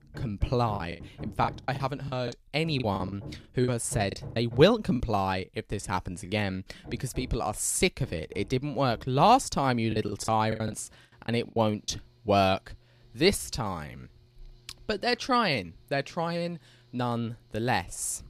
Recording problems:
machinery noise; noticeable; throughout; 20 dB below the speech
choppy; very; from 1 to 5 s and from 10 to 12 s; 16% of the speech affected

